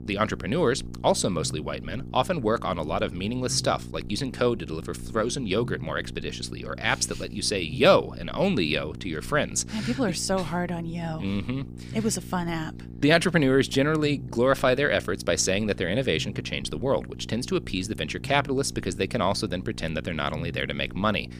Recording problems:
electrical hum; faint; throughout; 60 Hz, 20 dB below the speech

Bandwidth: 15 kHz